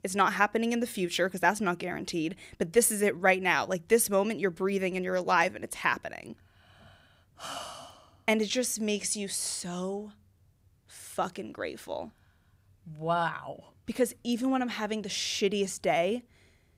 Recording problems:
none

